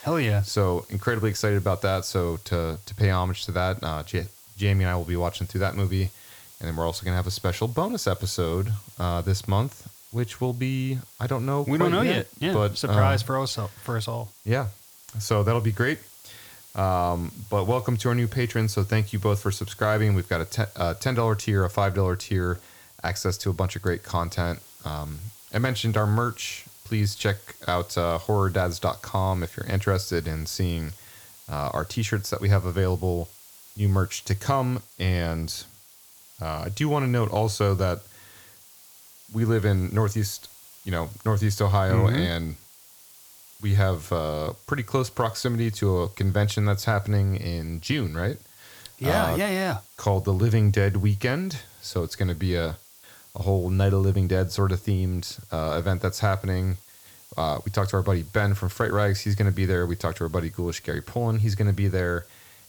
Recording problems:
hiss; faint; throughout; 20 dB below the speech

